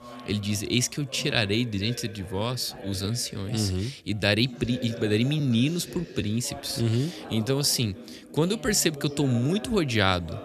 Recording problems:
background chatter; noticeable; throughout; 3 voices, 15 dB below the speech
uneven, jittery; strongly; from 1 to 9.5 s

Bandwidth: 14 kHz